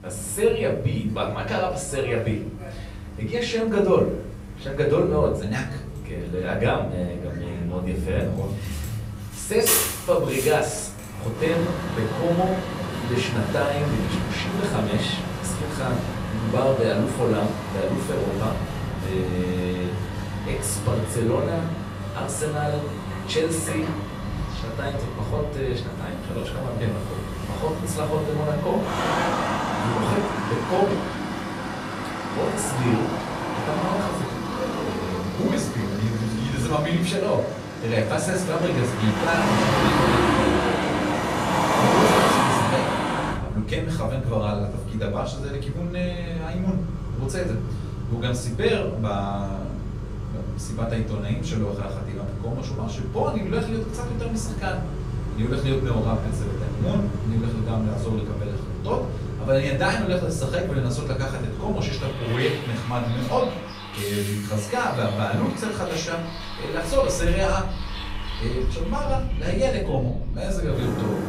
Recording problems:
off-mic speech; far
room echo; slight; dies away in 0.5 s
traffic noise; loud; throughout; 2 dB below the speech
electrical hum; faint; throughout; 50 Hz, 25 dB below the speech

